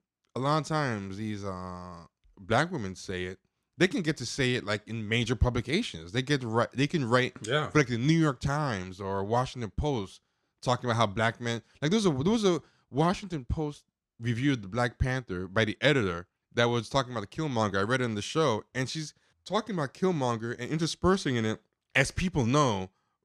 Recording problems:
none

